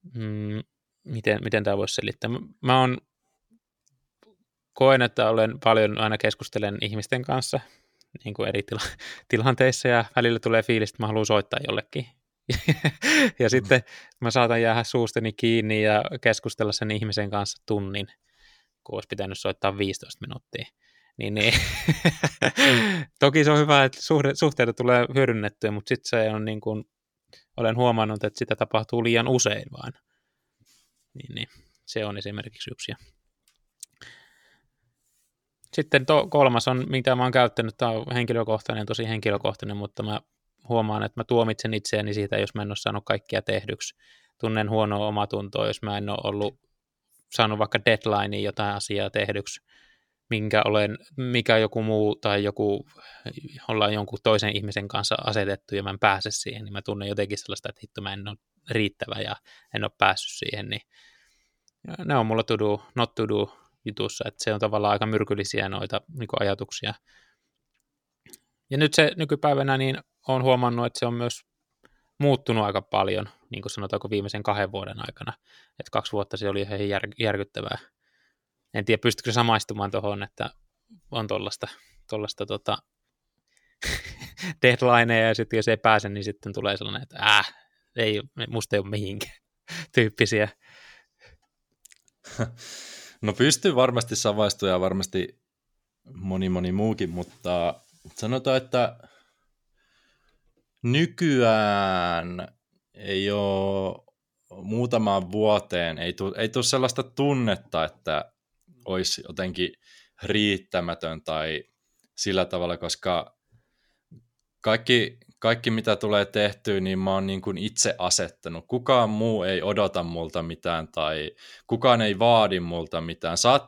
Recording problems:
none

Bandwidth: 18.5 kHz